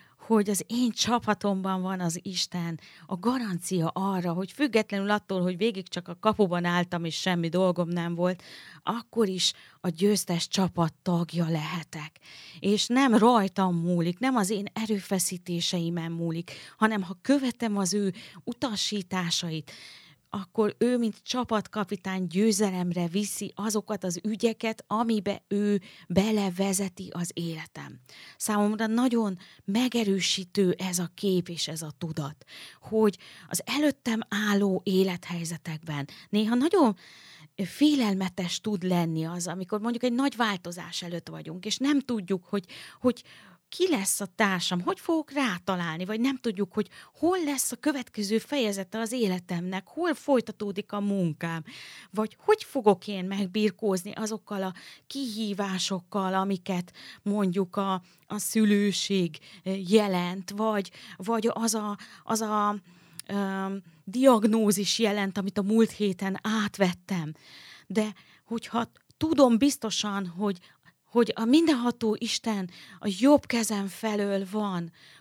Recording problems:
none

